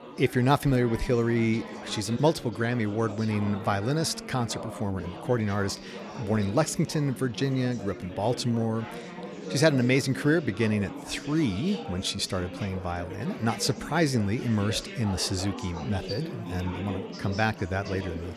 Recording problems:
chatter from many people; noticeable; throughout; 10 dB below the speech

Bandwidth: 14 kHz